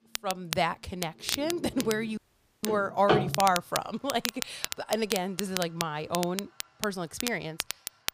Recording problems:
household noises; loud; throughout; 2 dB below the speech
crackle, like an old record; loud; 5 dB below the speech
audio cutting out; at 2 s

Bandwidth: 15 kHz